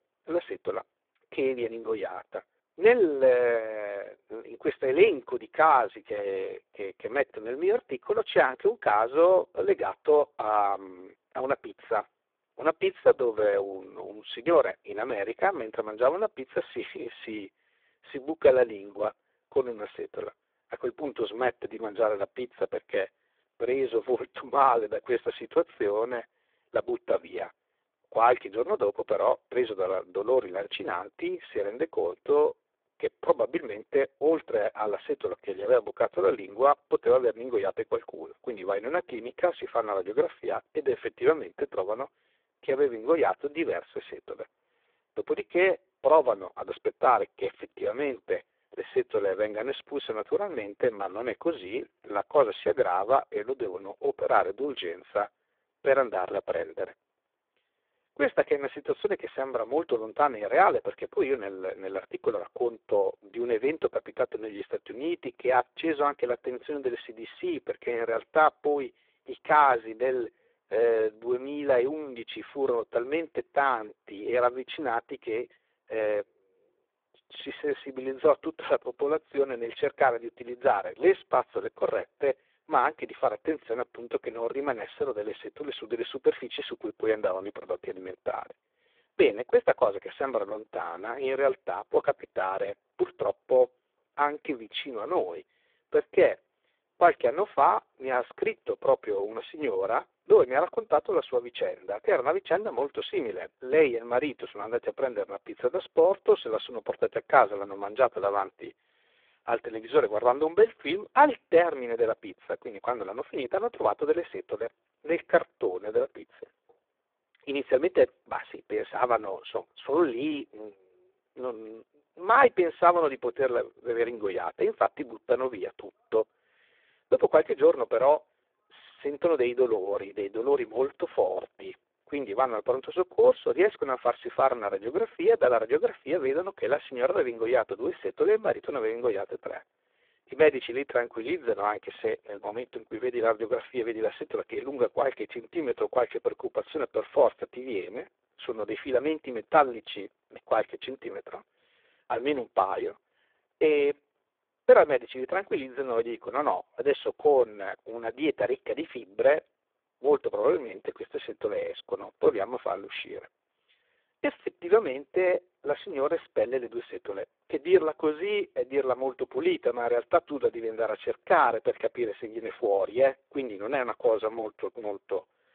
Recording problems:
phone-call audio; poor line

